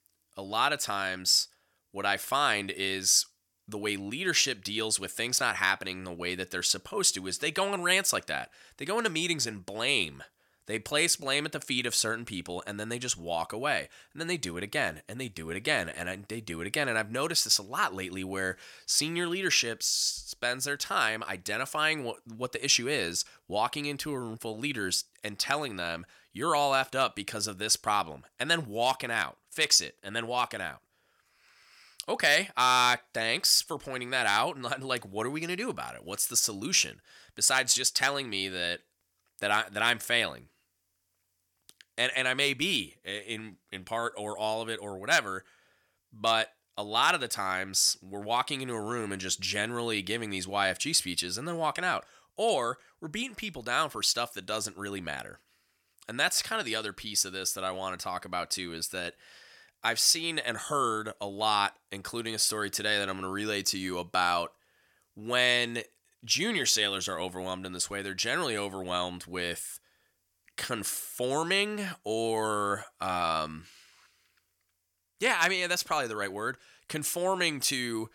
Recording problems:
thin; somewhat; fading below 750 Hz

